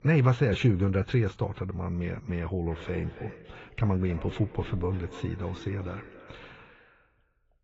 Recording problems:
garbled, watery; badly; nothing above 7.5 kHz
echo of what is said; faint; from 2.5 s on; 270 ms later, 20 dB below the speech
muffled; very slightly; fading above 3.5 kHz

